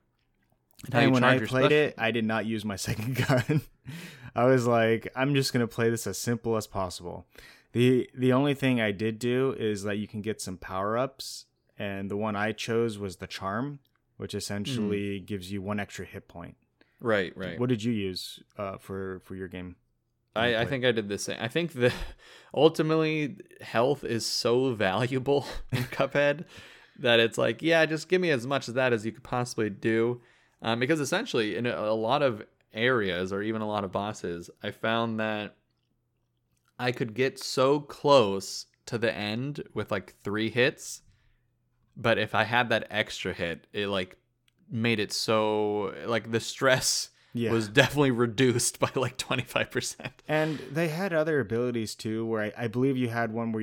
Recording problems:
abrupt cut into speech; at the end

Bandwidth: 17.5 kHz